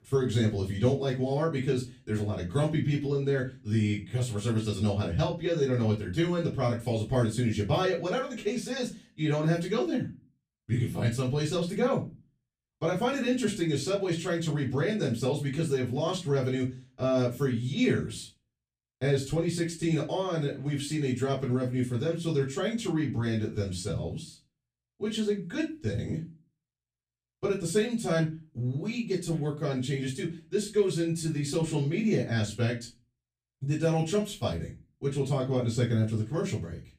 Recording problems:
off-mic speech; far
room echo; slight; dies away in 0.3 s

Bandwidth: 15 kHz